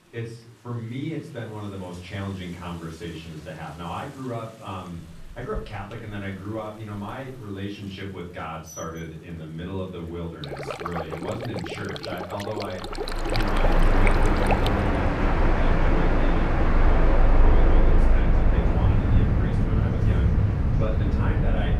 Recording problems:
off-mic speech; far
room echo; slight; dies away in 0.7 s
train or aircraft noise; very loud; from 13 s on; 10 dB above the speech
rain or running water; loud; until 15 s; as loud as the speech
background chatter; faint; throughout; 3 voices, 30 dB below the speech

